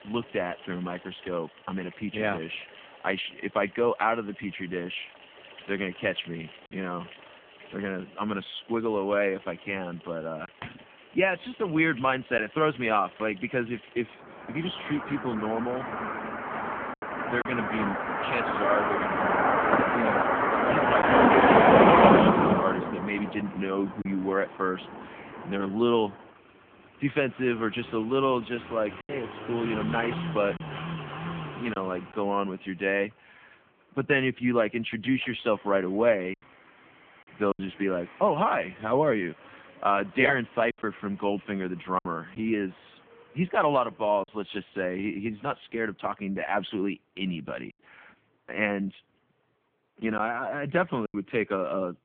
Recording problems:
phone-call audio; poor line; nothing above 3.5 kHz
traffic noise; very loud; throughout; 5 dB above the speech
choppy; occasionally; 2% of the speech affected

